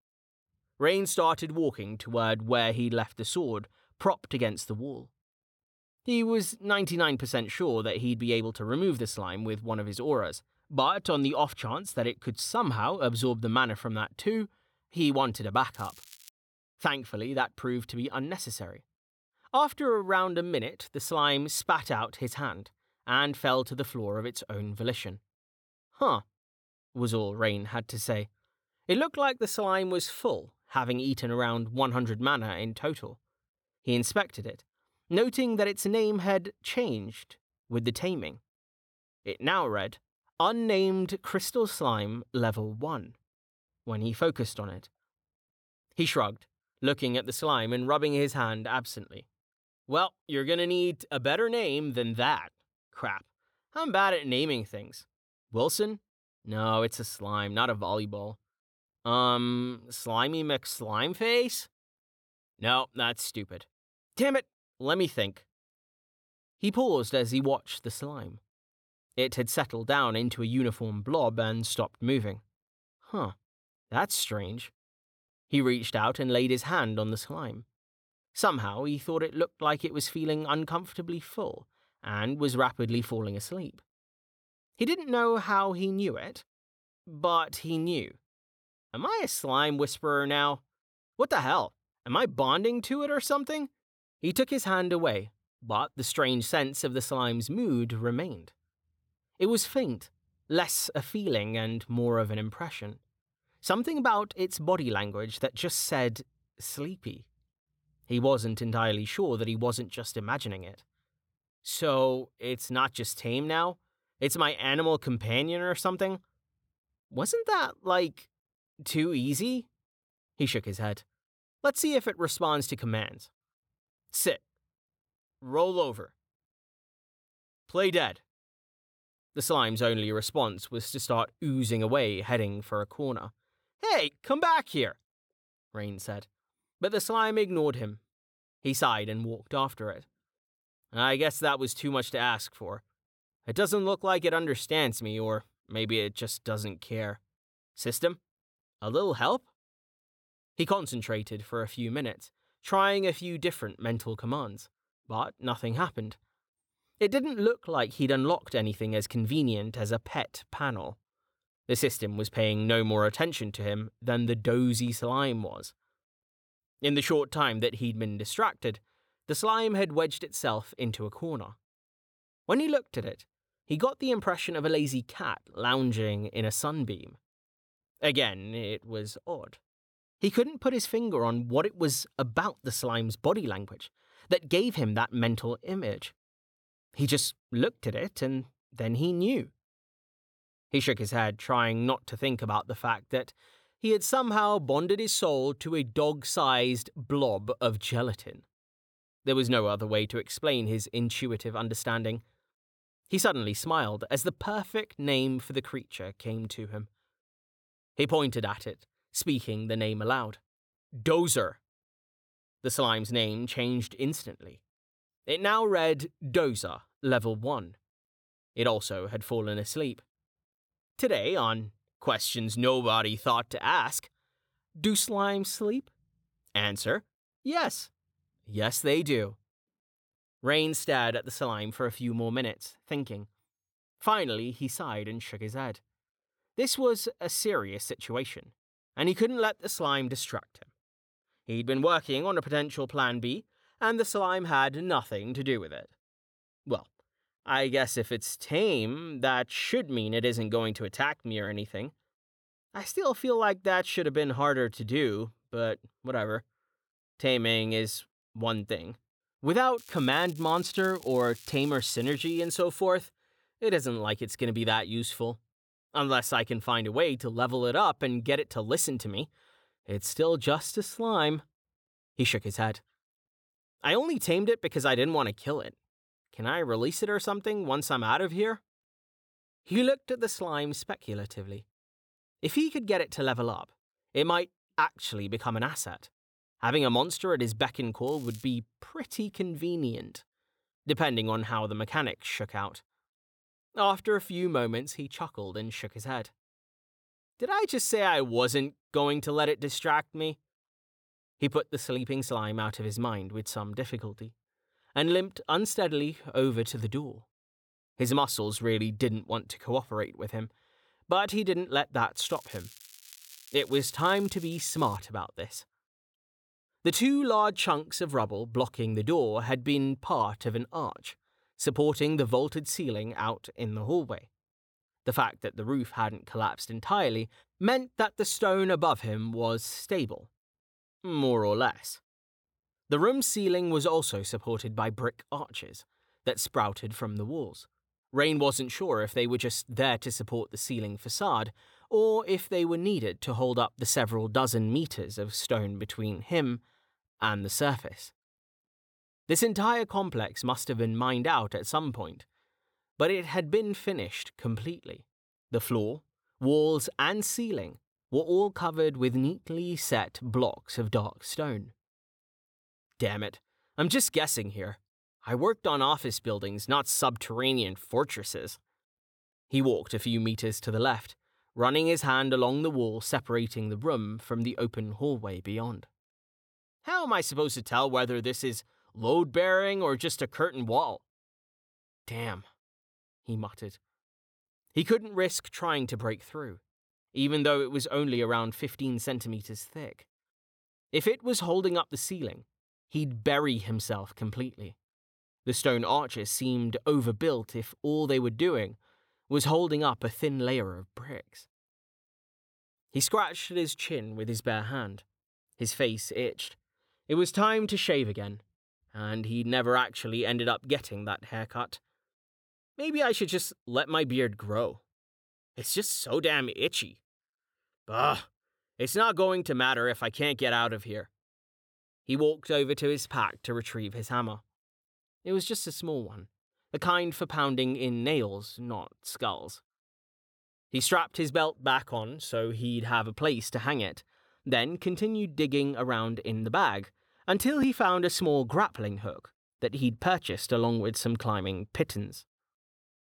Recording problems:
crackling; faint; 4 times, first at 16 s; 20 dB below the speech

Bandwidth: 17.5 kHz